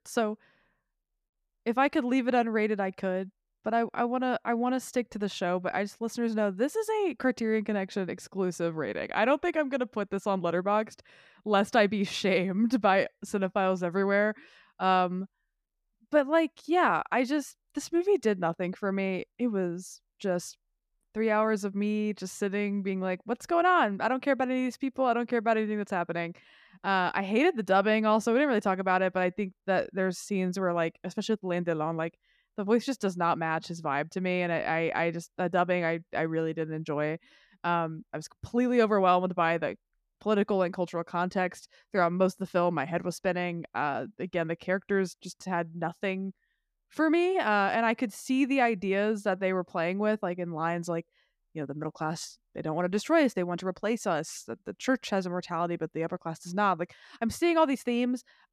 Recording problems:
none

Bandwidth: 14.5 kHz